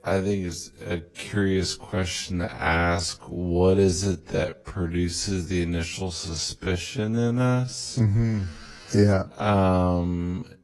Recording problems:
wrong speed, natural pitch; too slow; 0.5 times normal speed
garbled, watery; slightly; nothing above 11.5 kHz

